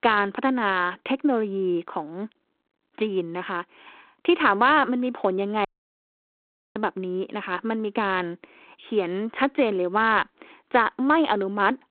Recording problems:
phone-call audio; nothing above 3.5 kHz
audio cutting out; at 5.5 s for 1 s

